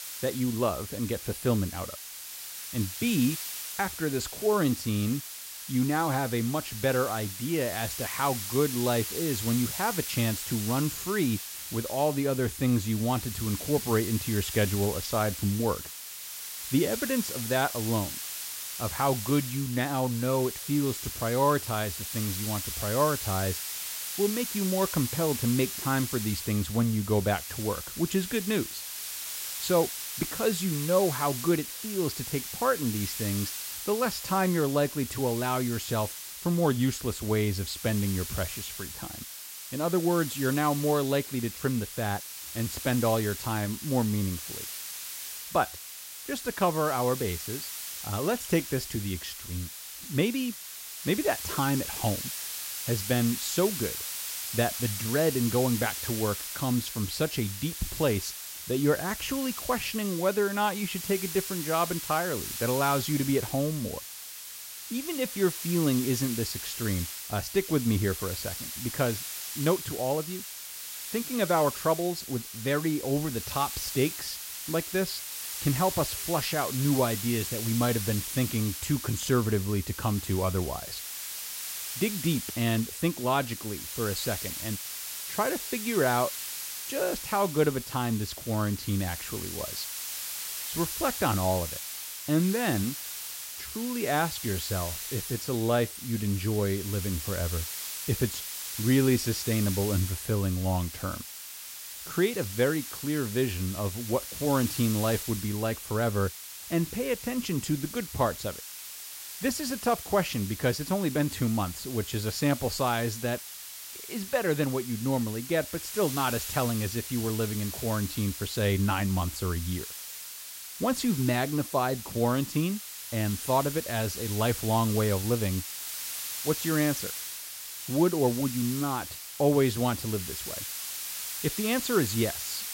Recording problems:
hiss; loud; throughout; 6 dB below the speech

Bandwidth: 16 kHz